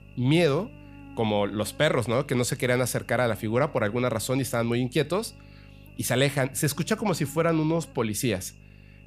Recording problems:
electrical hum; faint; throughout; 50 Hz, 25 dB below the speech

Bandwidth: 15 kHz